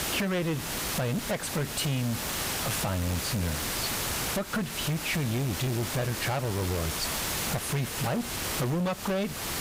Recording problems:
distortion; heavy; 27% of the sound clipped
squashed, flat; somewhat
hiss; loud; throughout; 1 dB below the speech

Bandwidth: 15.5 kHz